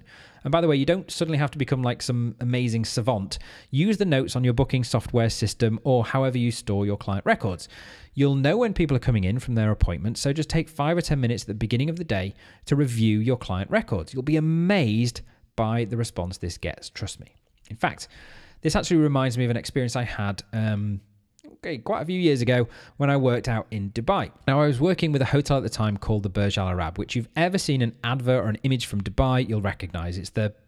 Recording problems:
uneven, jittery; slightly; from 7.5 to 29 s

